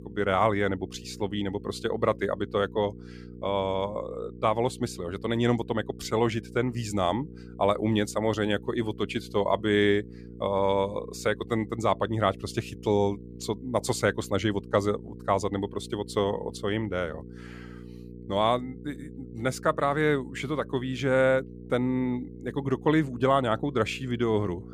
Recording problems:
electrical hum; faint; throughout; 60 Hz, 20 dB below the speech

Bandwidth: 15 kHz